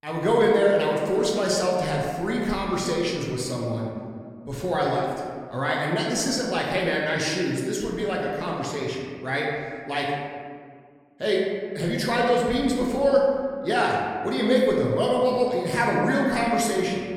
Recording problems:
room echo; noticeable; dies away in 1.7 s
off-mic speech; somewhat distant

